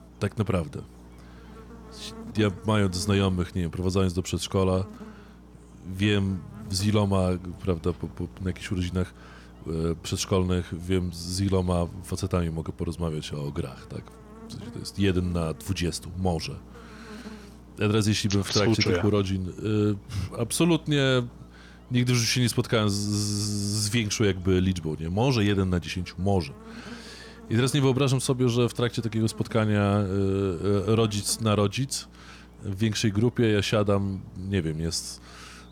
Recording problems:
electrical hum; faint; throughout; 60 Hz, 20 dB below the speech

